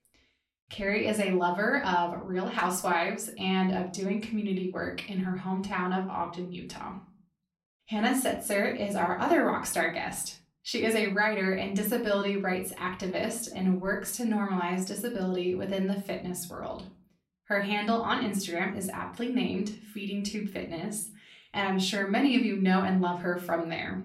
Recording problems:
off-mic speech; far
room echo; slight; dies away in 0.3 s

